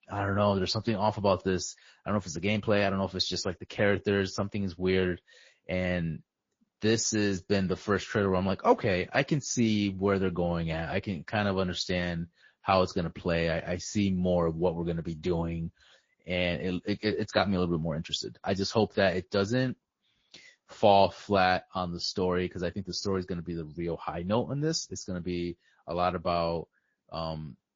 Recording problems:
garbled, watery; slightly; nothing above 7 kHz

